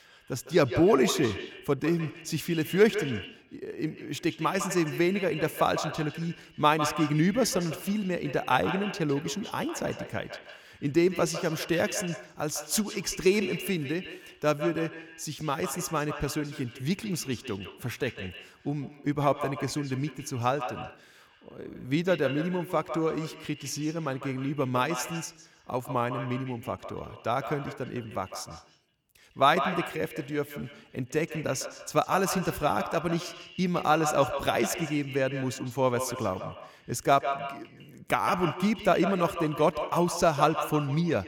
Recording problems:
echo of what is said; strong; throughout; 150 ms later, 9 dB below the speech

